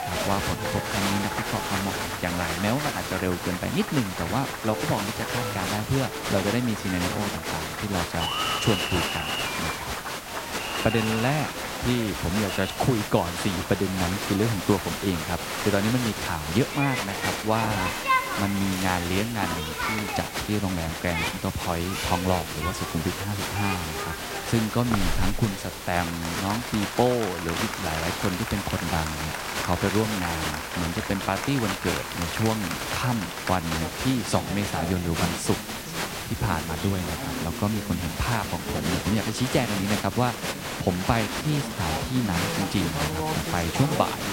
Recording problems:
crowd noise; loud; throughout; 2 dB below the speech
hiss; loud; throughout; 10 dB below the speech

